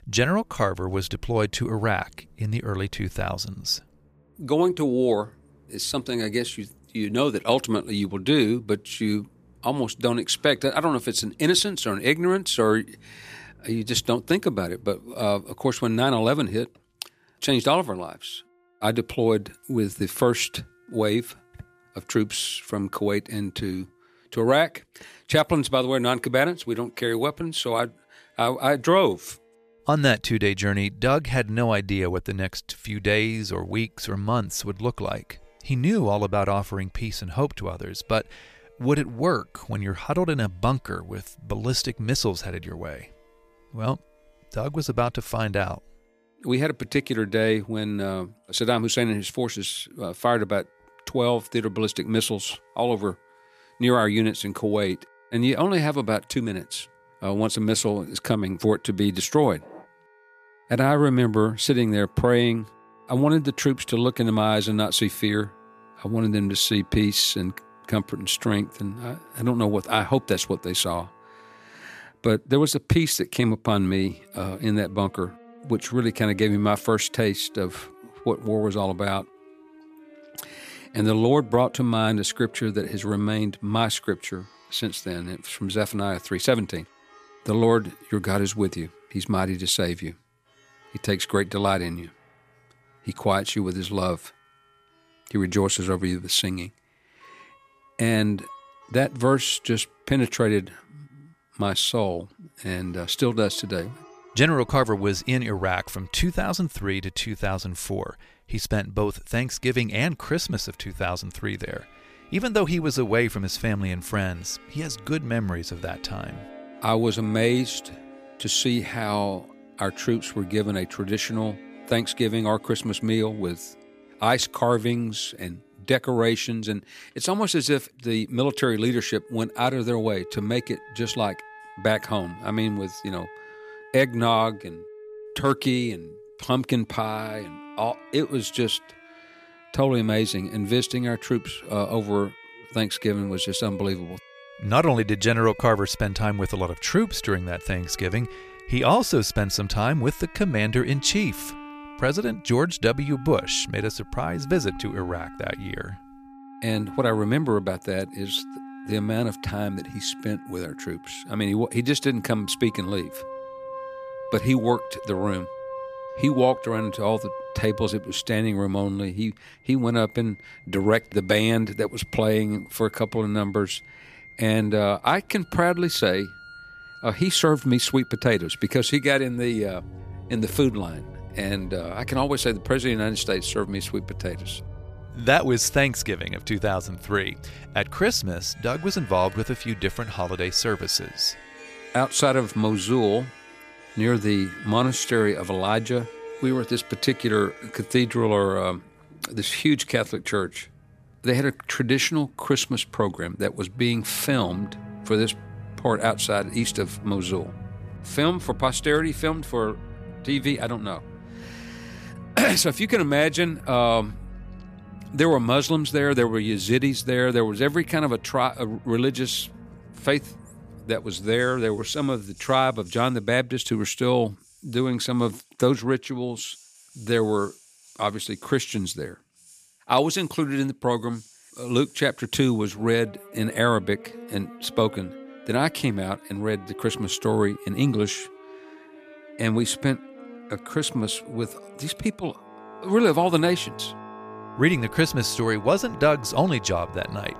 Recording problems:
background music; noticeable; throughout; 20 dB below the speech

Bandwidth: 14.5 kHz